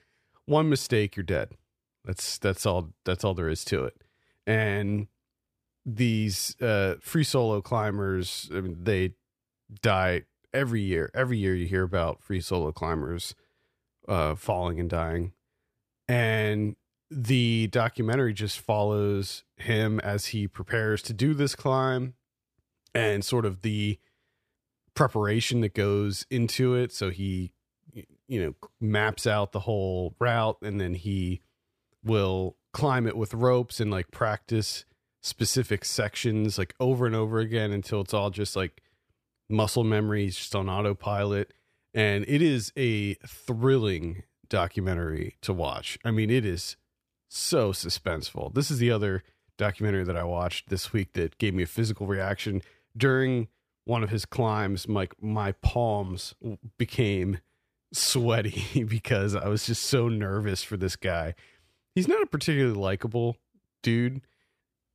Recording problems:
none

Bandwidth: 15 kHz